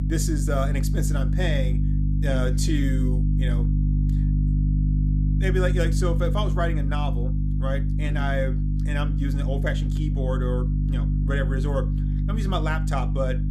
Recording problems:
electrical hum; loud; throughout; 50 Hz, 6 dB below the speech

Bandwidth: 14.5 kHz